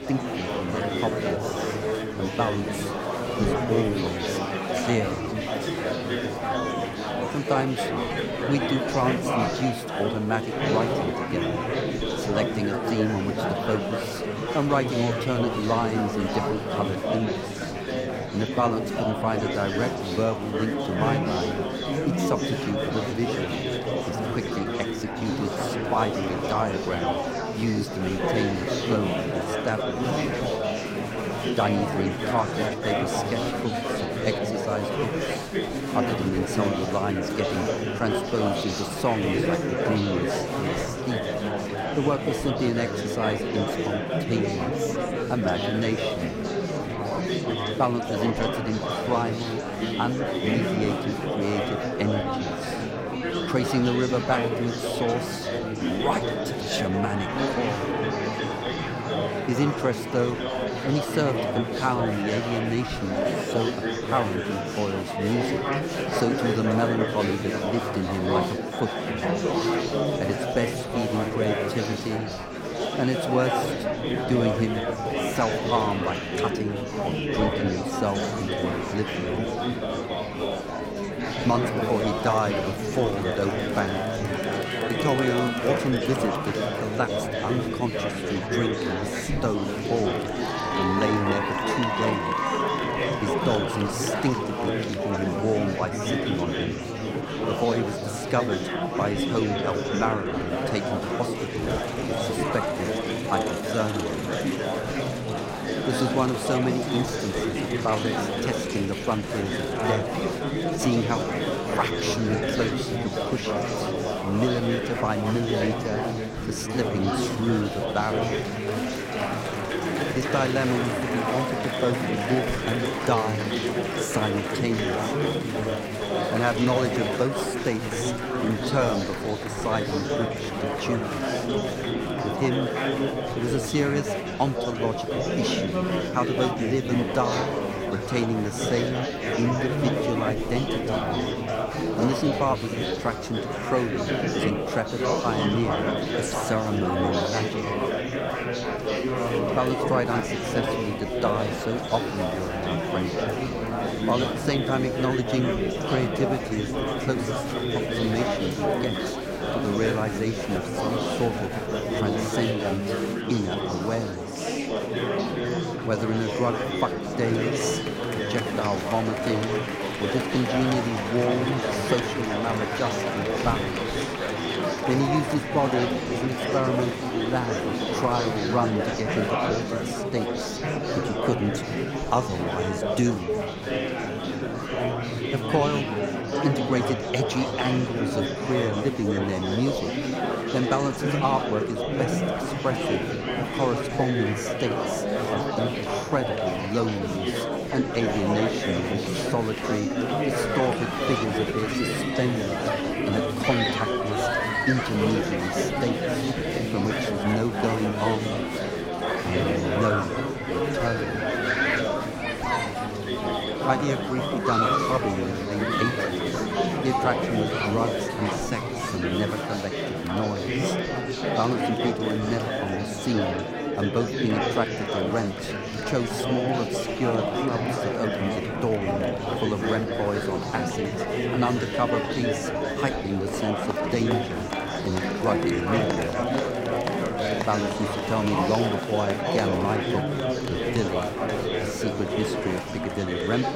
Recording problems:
murmuring crowd; very loud; throughout; 1 dB above the speech

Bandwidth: 16 kHz